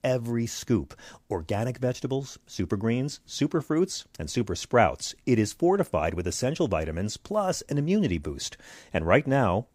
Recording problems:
none

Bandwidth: 15.5 kHz